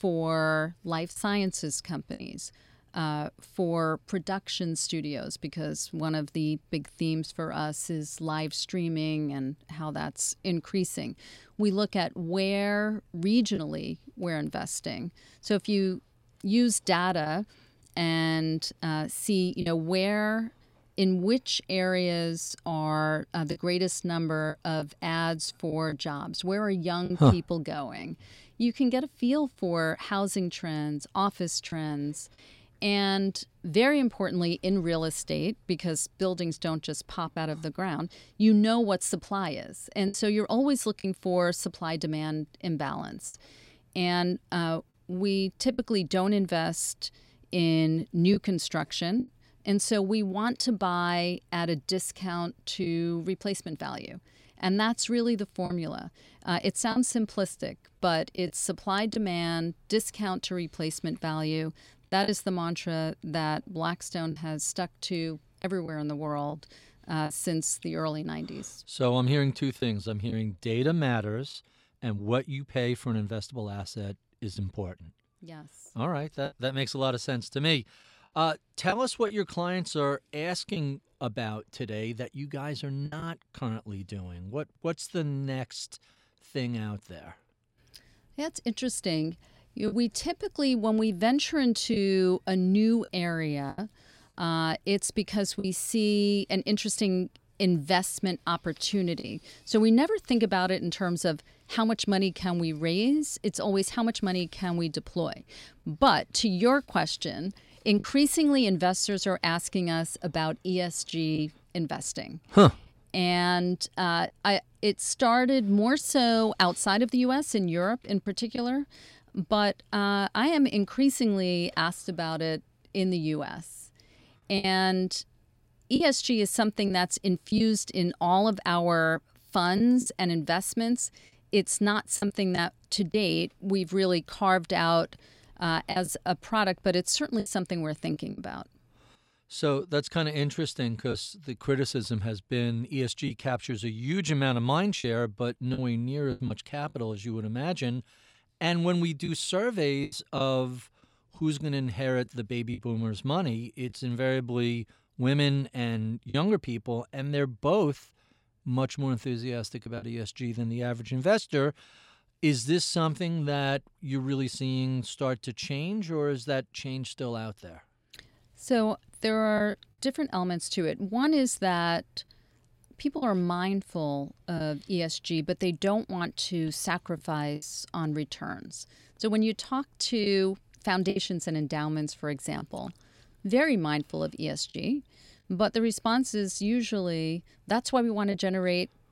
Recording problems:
choppy; occasionally; 2% of the speech affected

